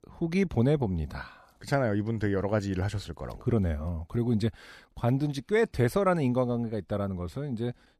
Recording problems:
none

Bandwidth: 14.5 kHz